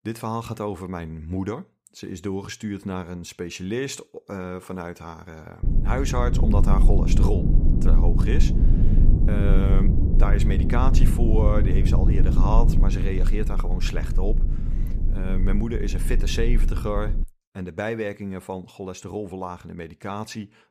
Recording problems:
low rumble; loud; from 5.5 to 17 s; 4 dB below the speech

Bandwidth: 15 kHz